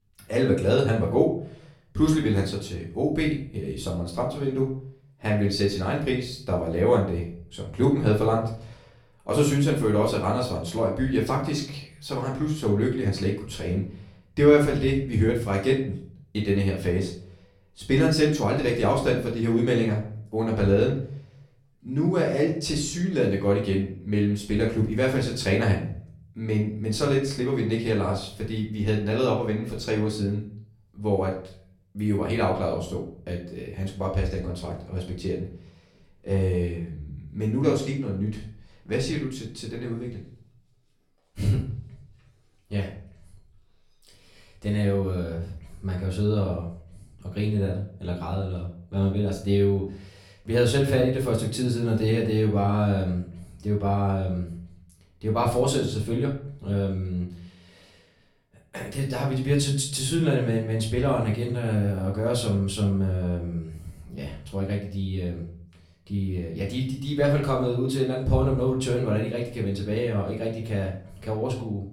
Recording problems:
off-mic speech; far
room echo; slight; dies away in 0.5 s

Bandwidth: 16.5 kHz